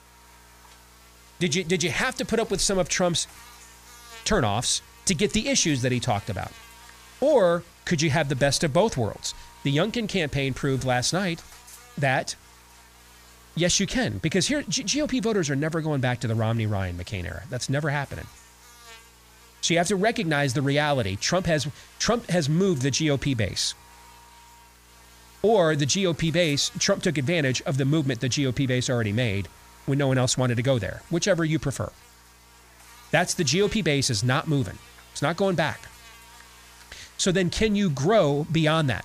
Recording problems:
electrical hum; faint; throughout; 60 Hz, 25 dB below the speech

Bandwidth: 15 kHz